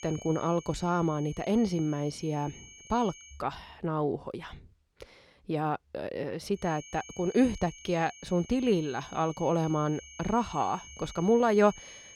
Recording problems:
high-pitched whine; noticeable; until 3.5 s and from 6.5 s on; 6.5 kHz, 20 dB below the speech

